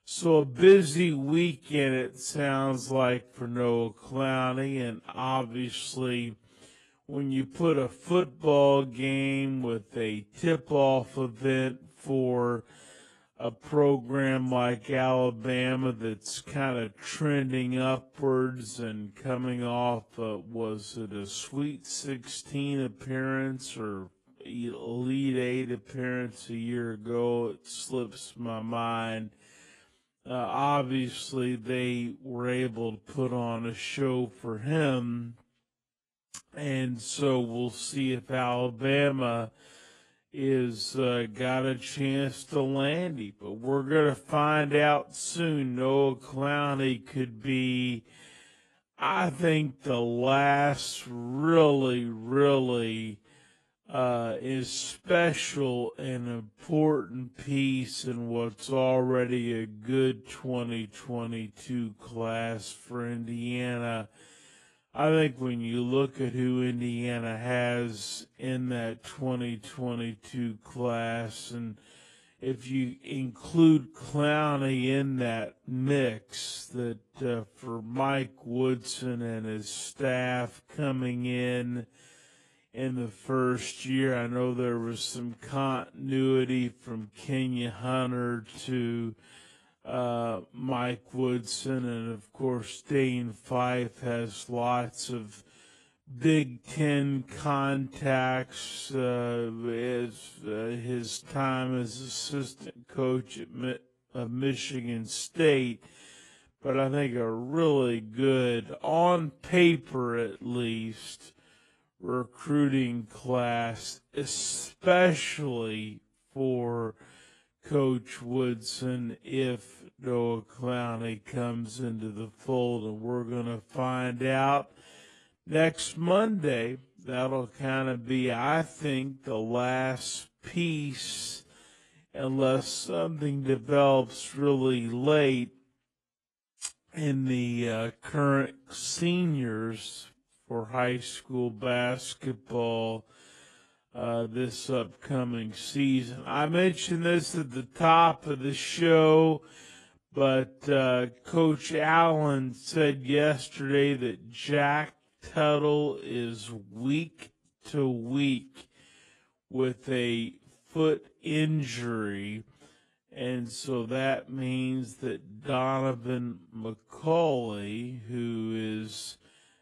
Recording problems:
wrong speed, natural pitch; too slow; 0.5 times normal speed
garbled, watery; slightly; nothing above 11 kHz

